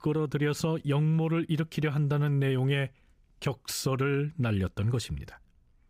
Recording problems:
none

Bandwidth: 15.5 kHz